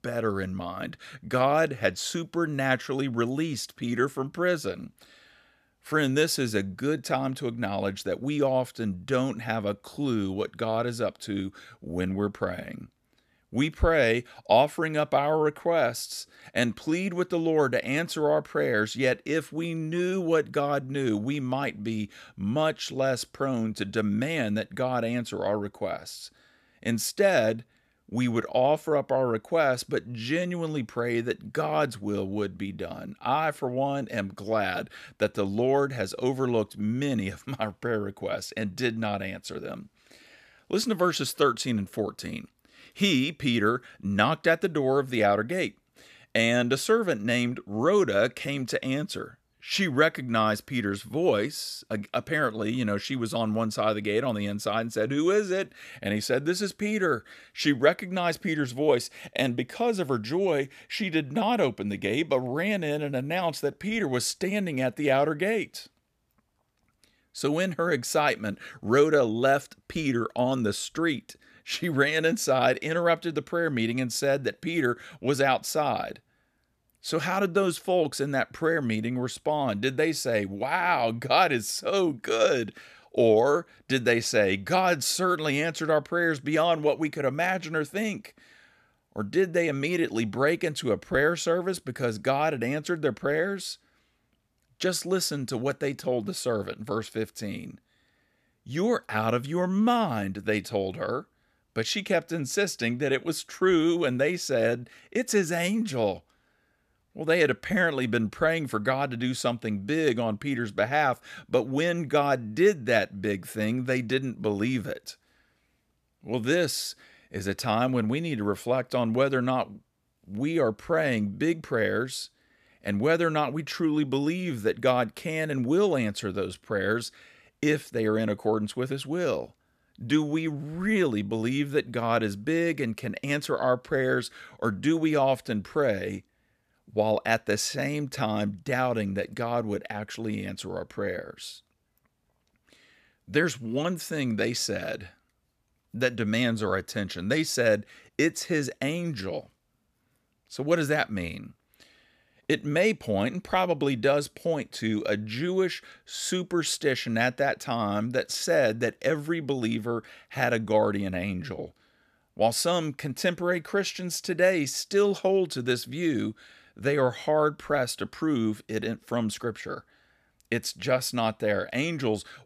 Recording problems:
none

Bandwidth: 14.5 kHz